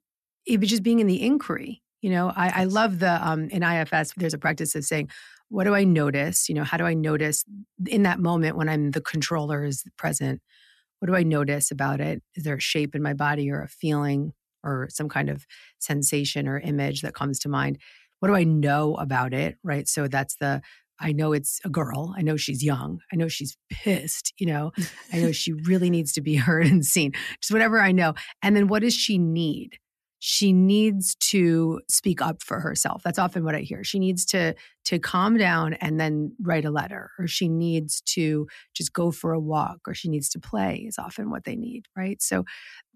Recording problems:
none

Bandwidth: 13.5 kHz